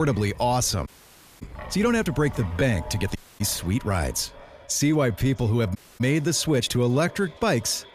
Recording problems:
echo of what is said; faint; throughout; 560 ms later, 20 dB below the speech
wind in the background; noticeable; throughout; 20 dB below the speech
abrupt cut into speech; at the start
uneven, jittery; strongly; from 0.5 to 7.5 s
audio cutting out; at 1 s for 0.5 s, at 3 s and at 6 s

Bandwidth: 14.5 kHz